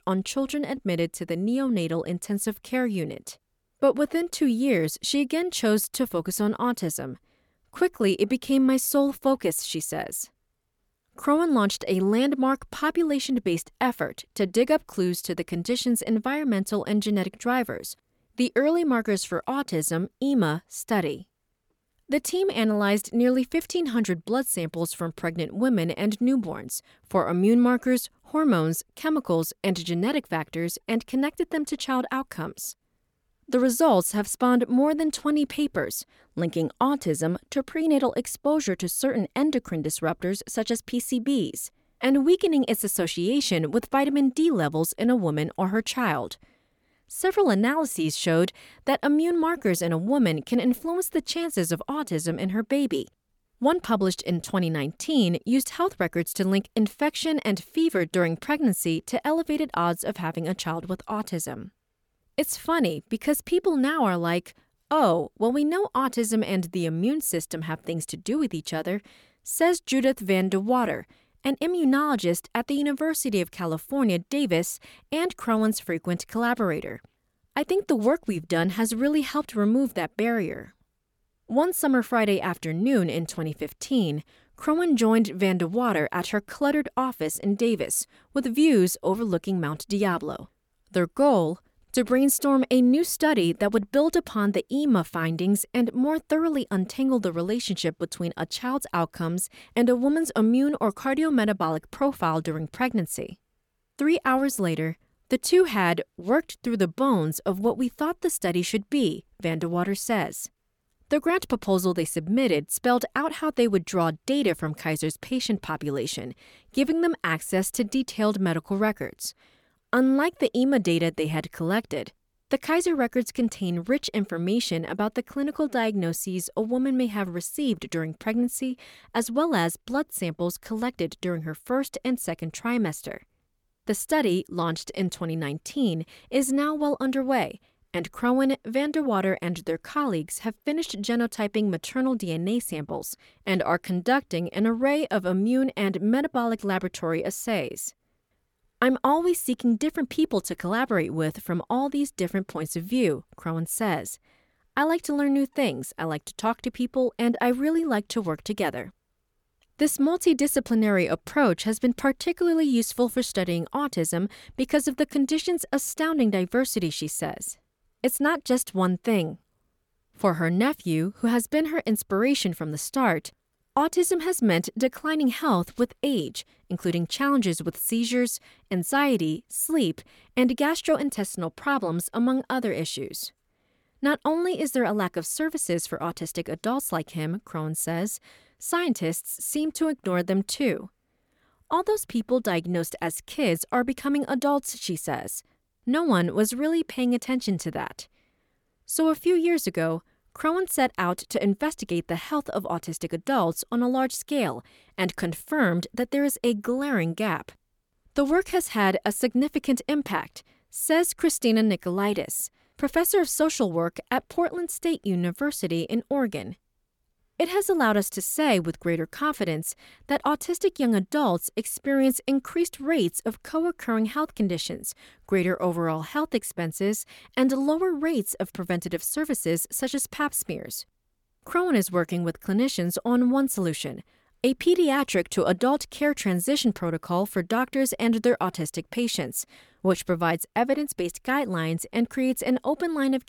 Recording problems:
none

